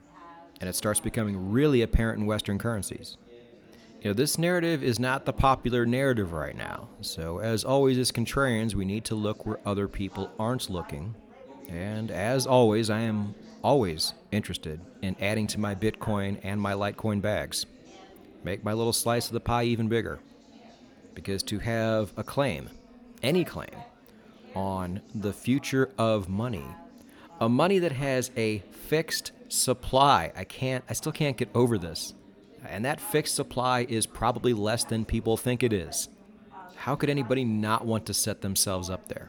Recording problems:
chatter from many people; faint; throughout; 20 dB below the speech

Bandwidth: 18.5 kHz